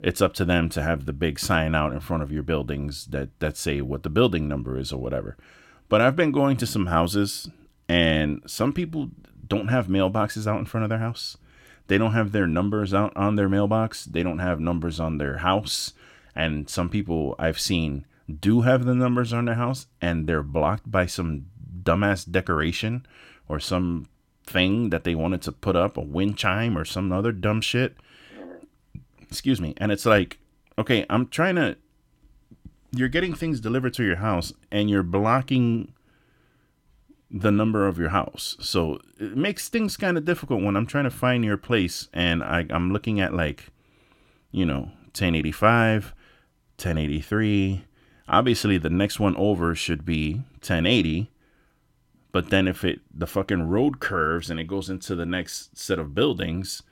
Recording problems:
none

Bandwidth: 16.5 kHz